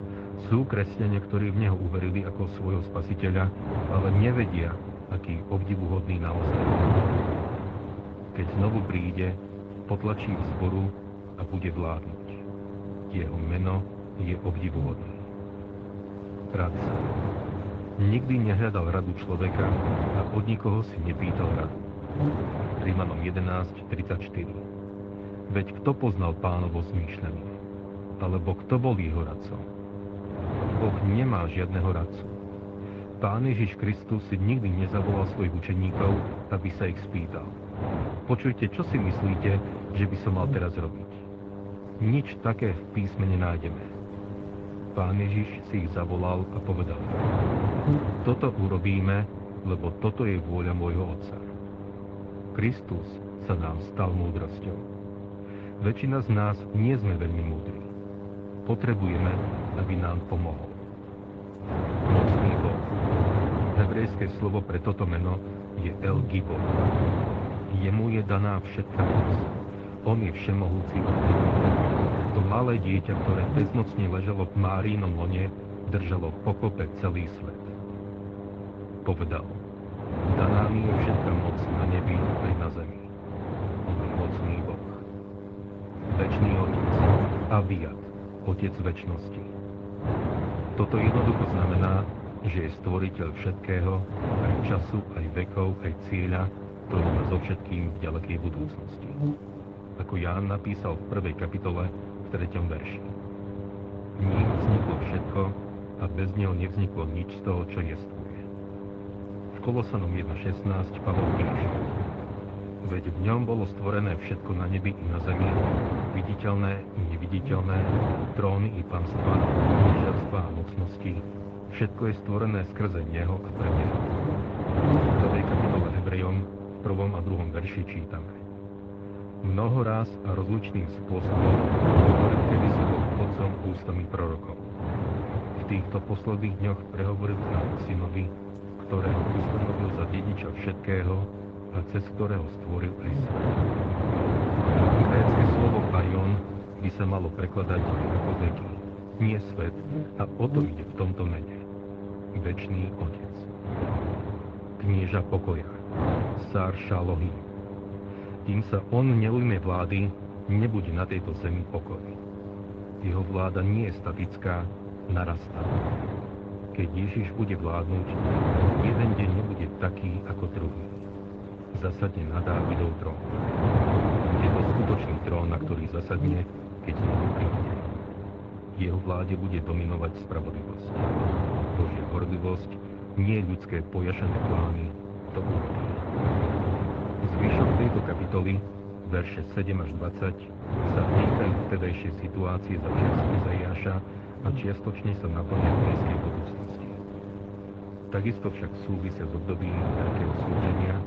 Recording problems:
muffled; very; fading above 2.5 kHz
garbled, watery; slightly
wind noise on the microphone; heavy; 2 dB above the speech
electrical hum; loud; throughout; 50 Hz, 9 dB below the speech

